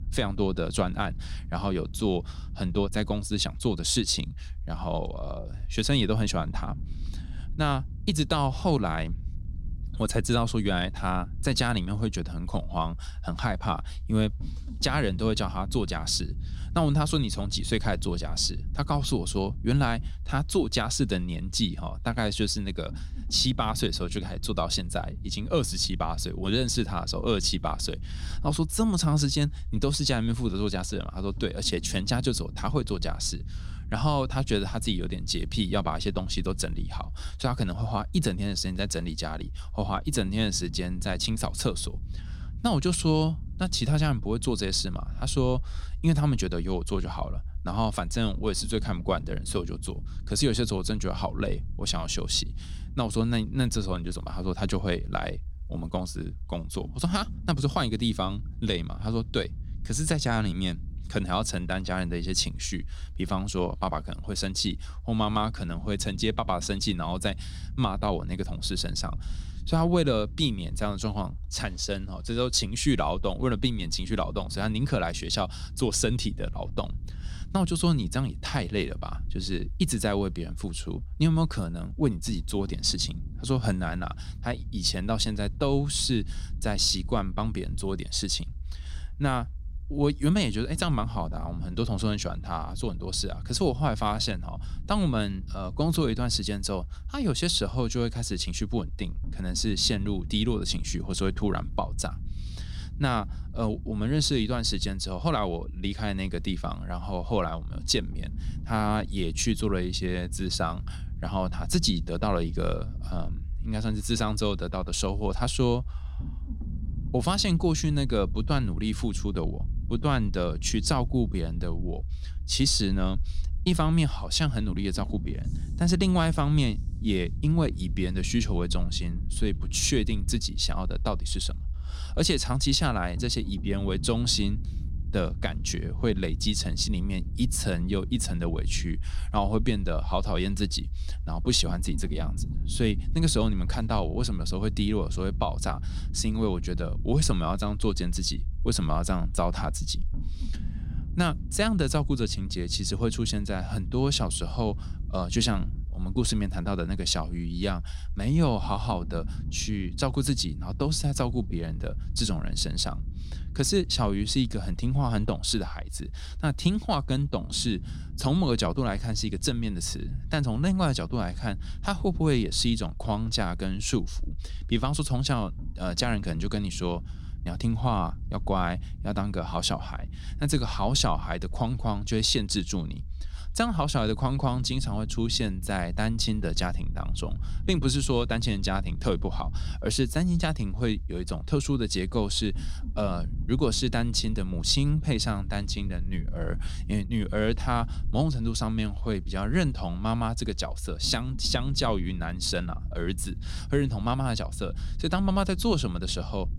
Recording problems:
low rumble; faint; throughout; 20 dB below the speech

